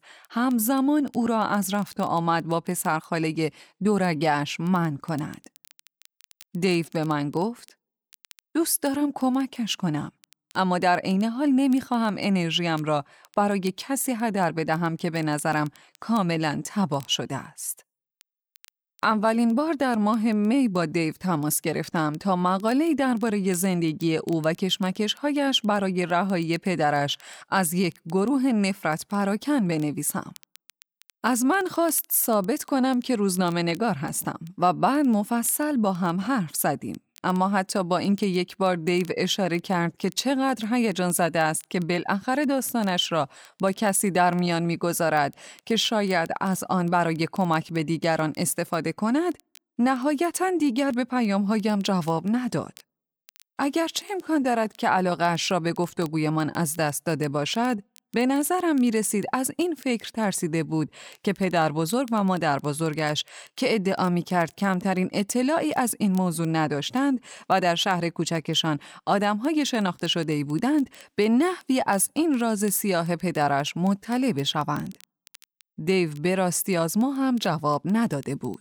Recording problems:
crackle, like an old record; faint; 30 dB below the speech

